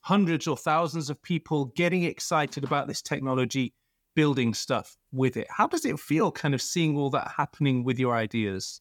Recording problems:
none

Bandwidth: 18.5 kHz